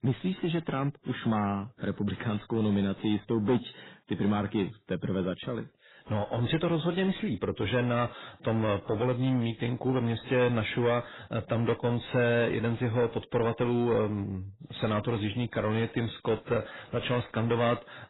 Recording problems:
garbled, watery; badly; nothing above 4 kHz
distortion; slight; 10 dB below the speech

